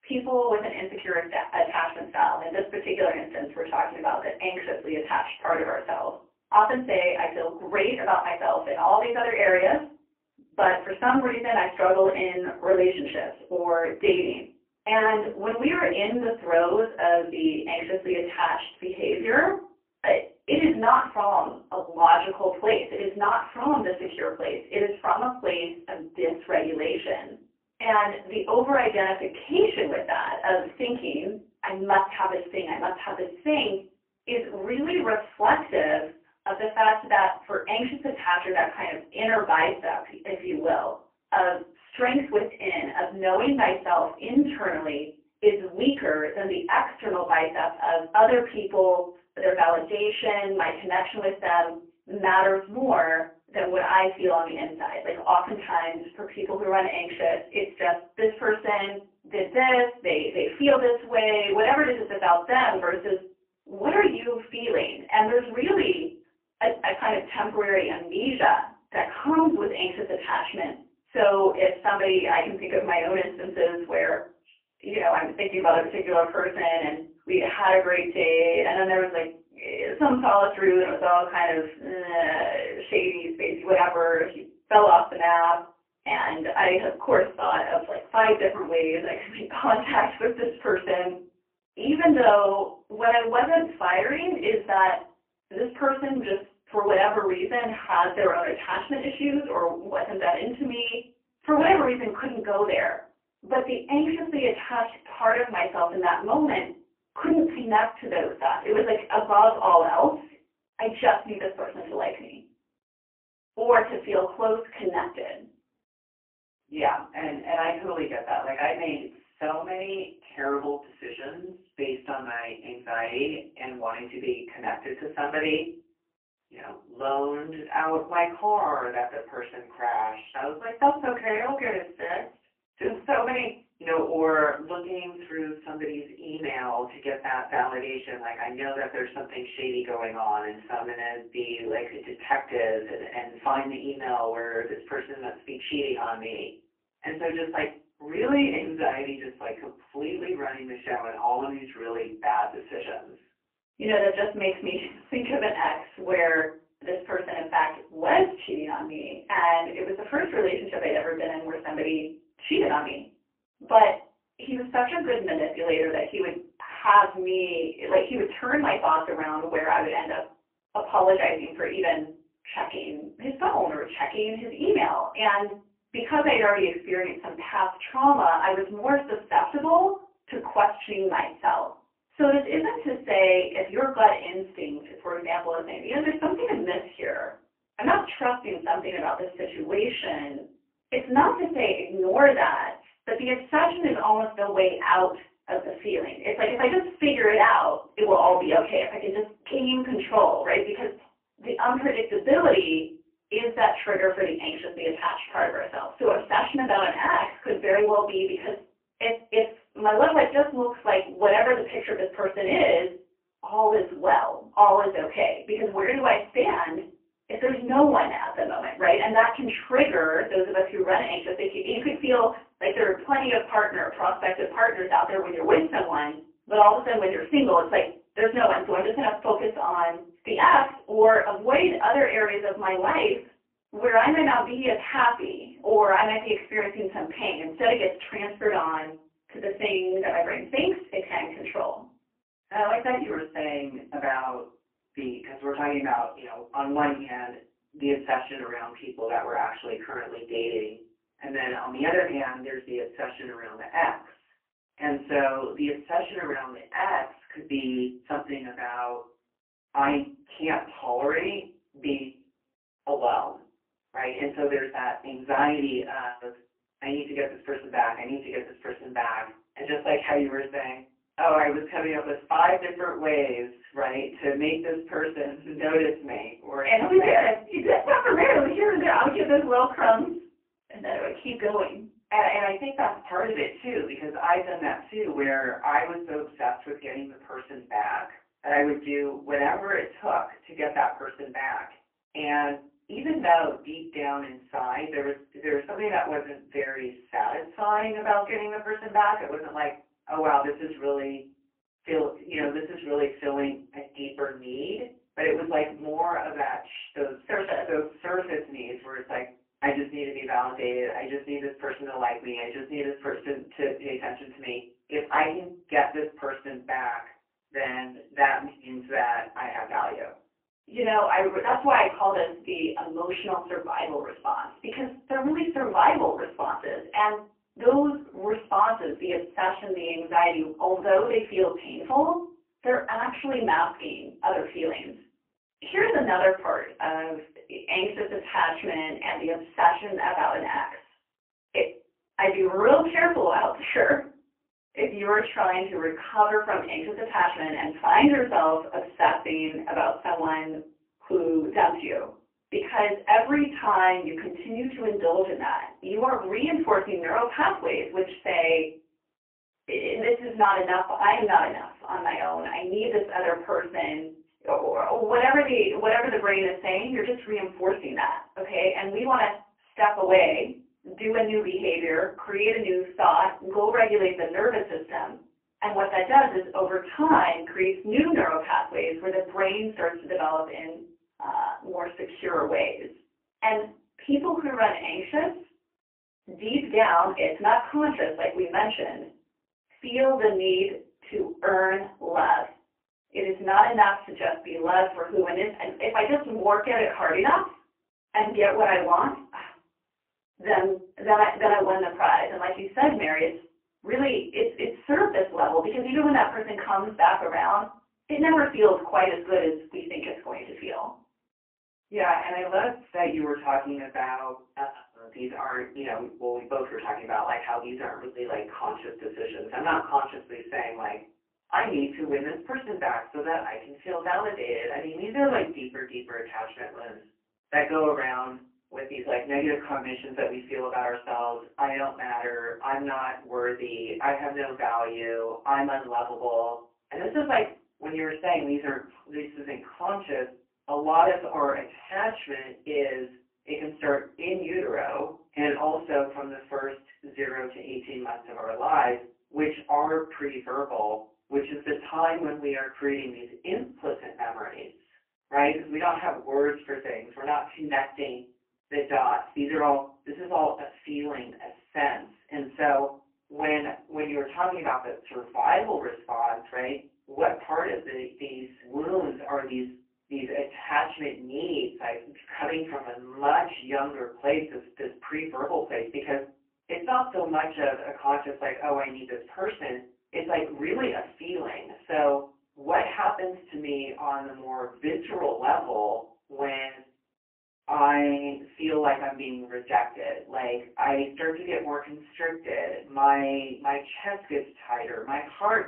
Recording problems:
phone-call audio; poor line; nothing above 3 kHz
off-mic speech; far
room echo; slight; dies away in 0.3 s

